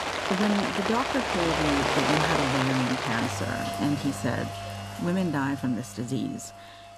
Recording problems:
rain or running water; very loud; throughout; 1 dB above the speech

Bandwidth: 14 kHz